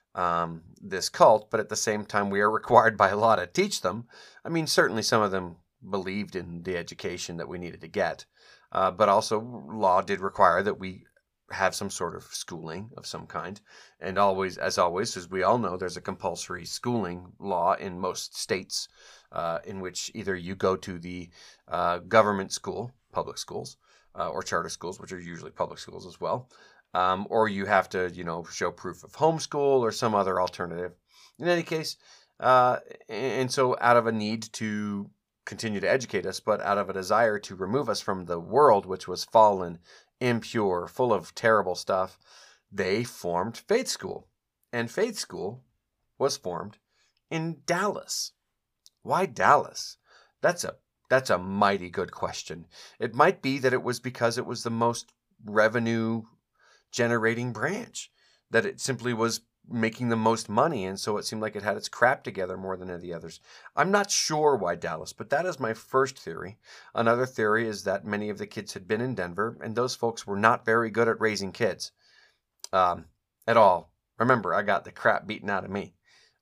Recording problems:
none

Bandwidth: 15 kHz